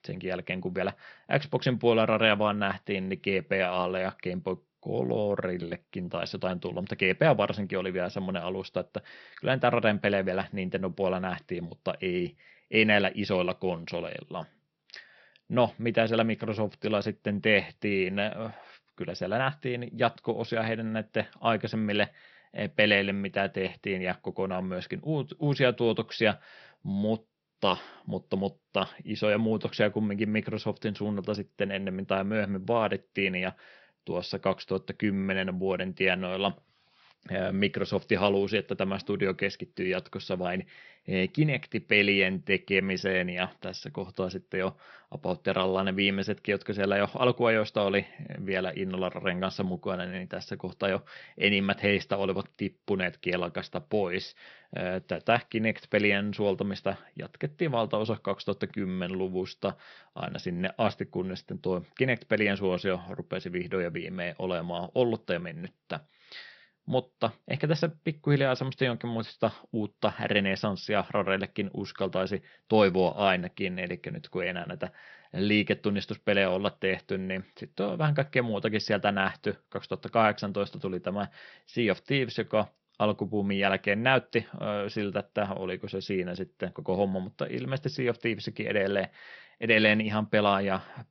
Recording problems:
high frequencies cut off; noticeable; nothing above 5.5 kHz

